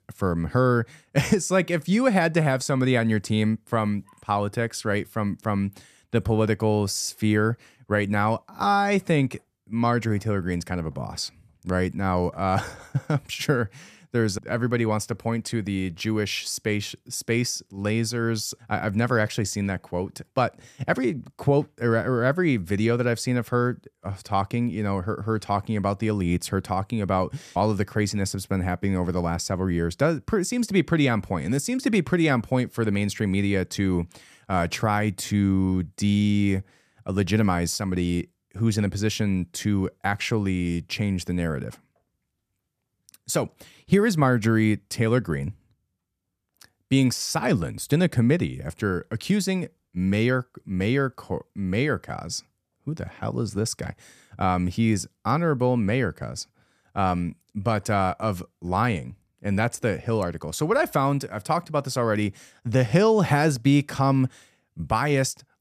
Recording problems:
none

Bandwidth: 14.5 kHz